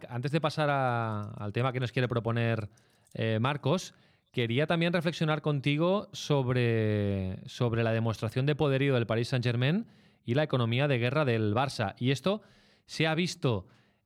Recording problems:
none

